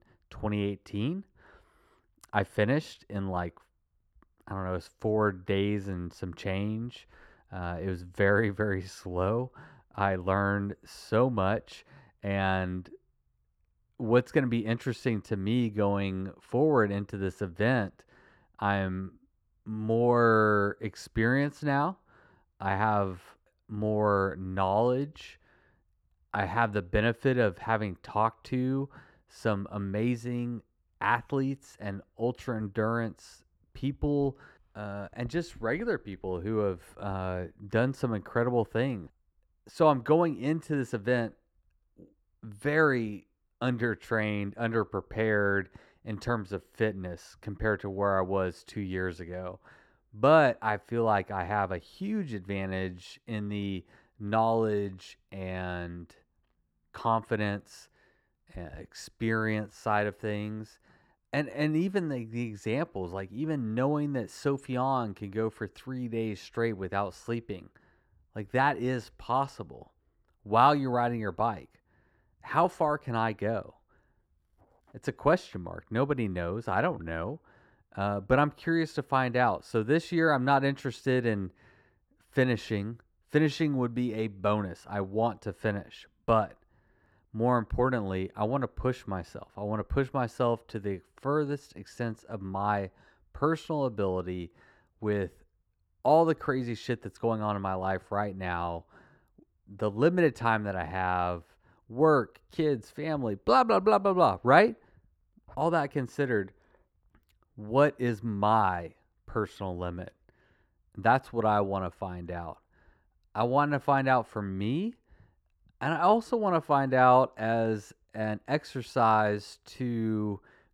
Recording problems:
muffled; slightly; fading above 2 kHz

